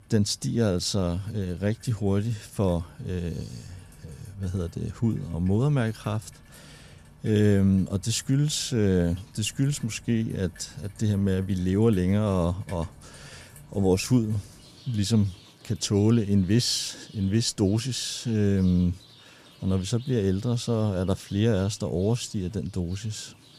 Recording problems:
rain or running water; faint; throughout; 25 dB below the speech

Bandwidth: 14.5 kHz